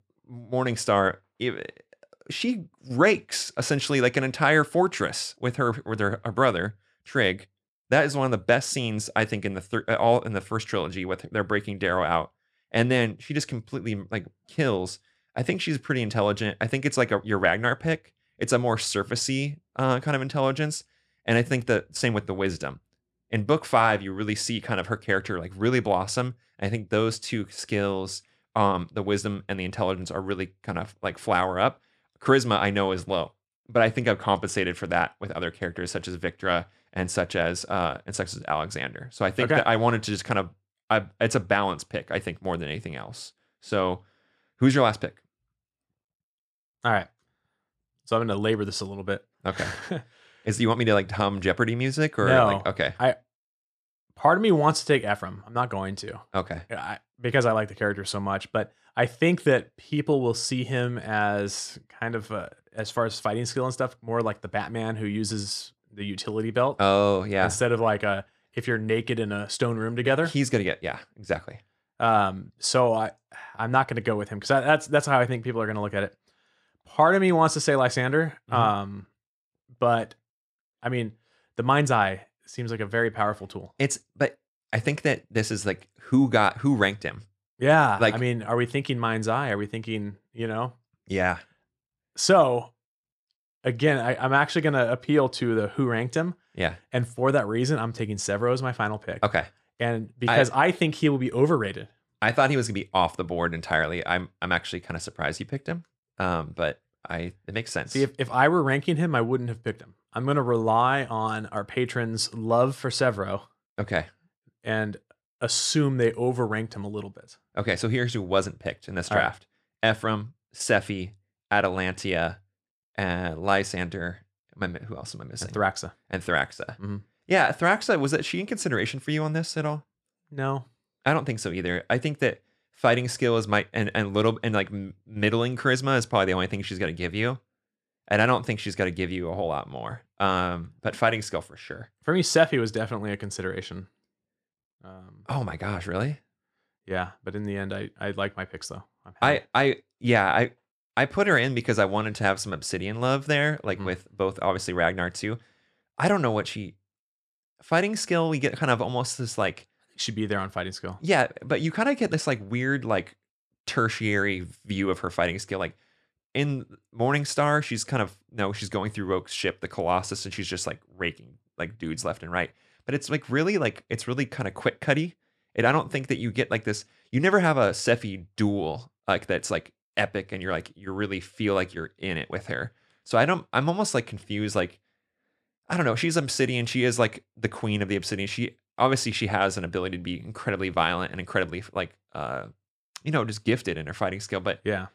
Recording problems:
none

